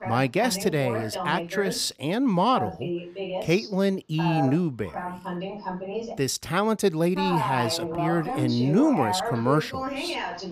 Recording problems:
voice in the background; loud; throughout; 6 dB below the speech

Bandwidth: 15.5 kHz